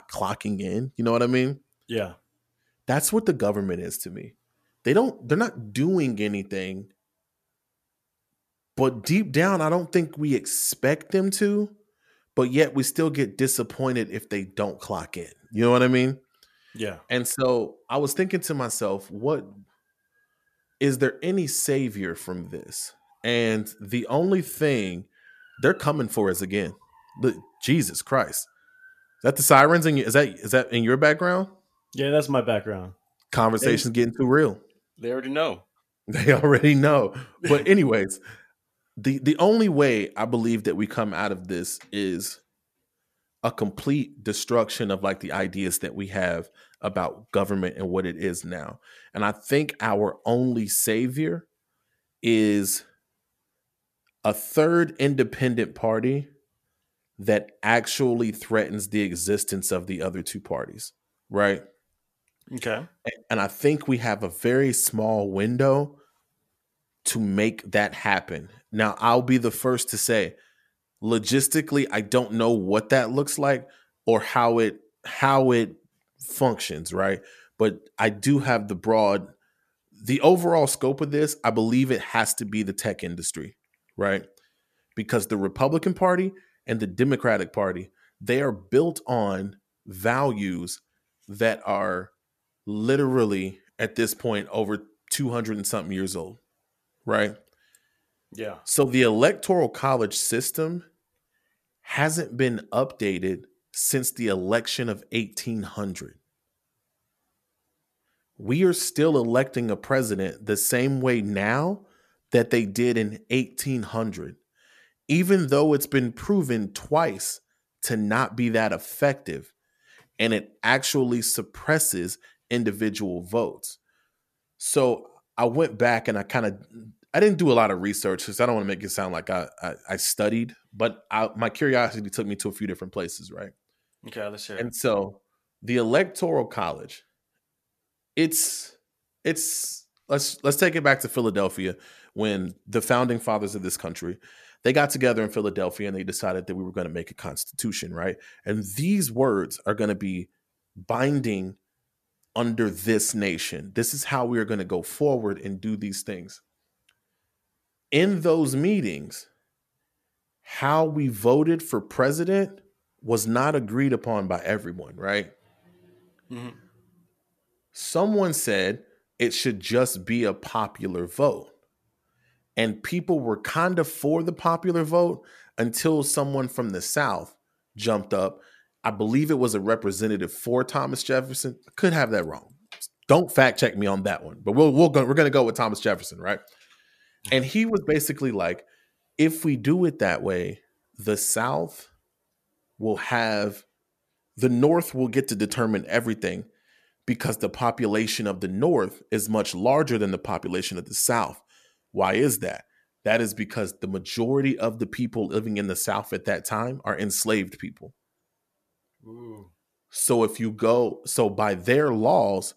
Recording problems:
none

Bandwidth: 14.5 kHz